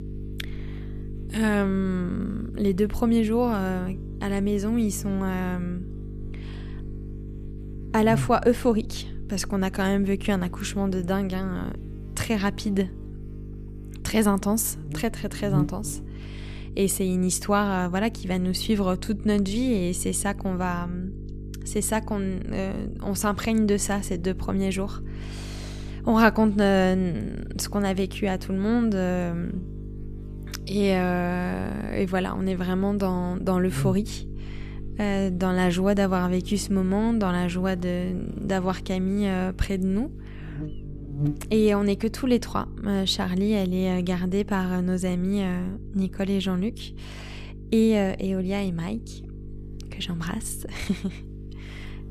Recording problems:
electrical hum; noticeable; throughout; 50 Hz, 15 dB below the speech

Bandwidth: 14.5 kHz